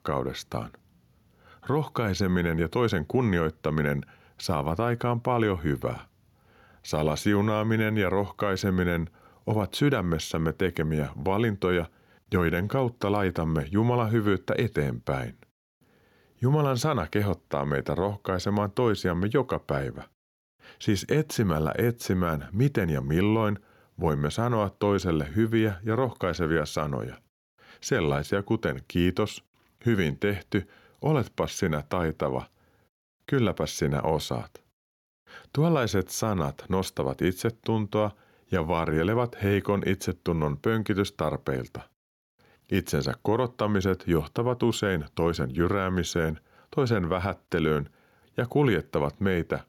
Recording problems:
none

